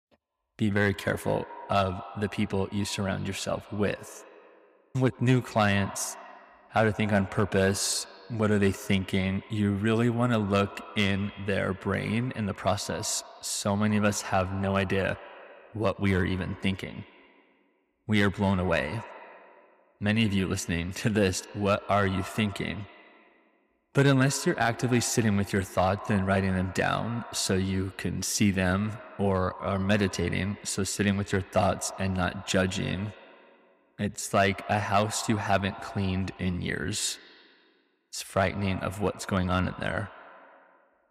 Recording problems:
echo of what is said; noticeable; throughout; 80 ms later, 15 dB below the speech

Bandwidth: 15.5 kHz